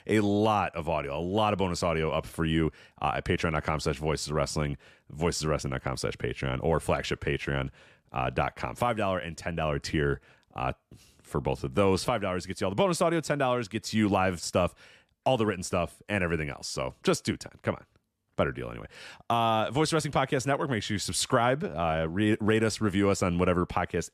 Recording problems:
none

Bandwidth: 14 kHz